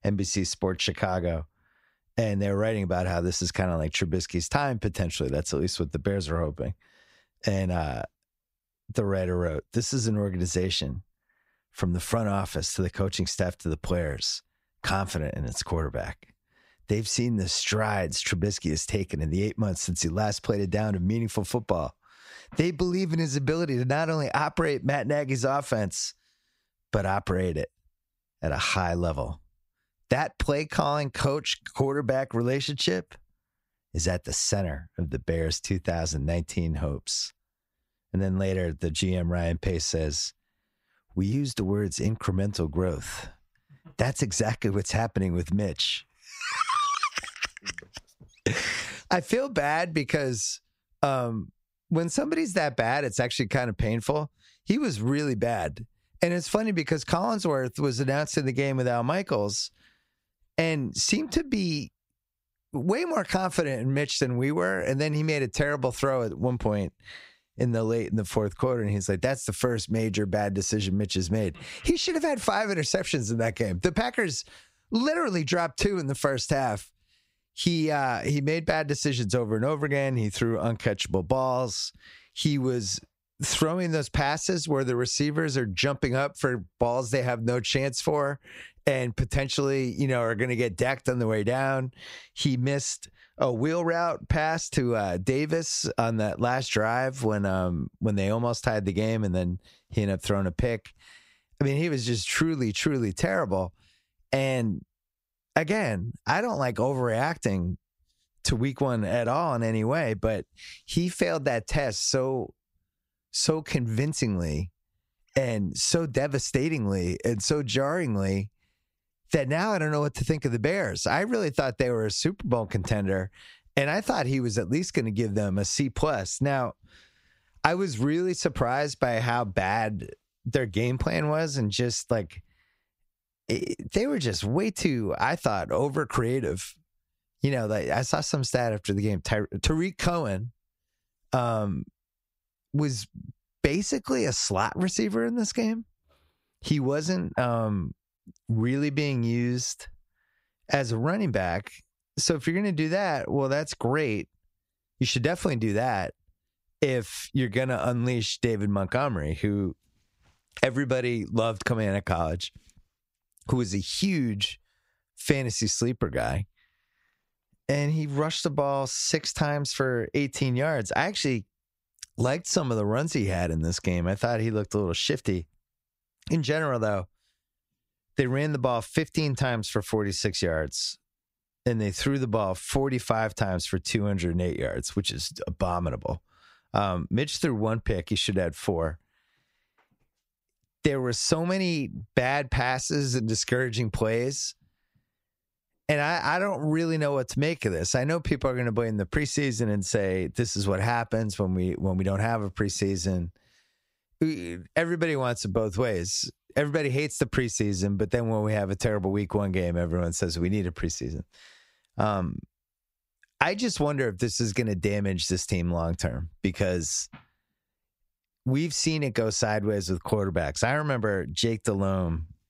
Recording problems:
squashed, flat; somewhat

